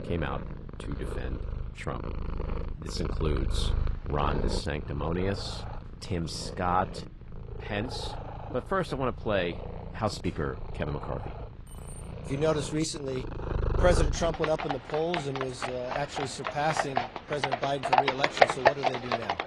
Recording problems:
garbled, watery; slightly
animal sounds; loud; throughout; 1 dB below the speech
jangling keys; faint; at 12 s; peak 15 dB below the speech

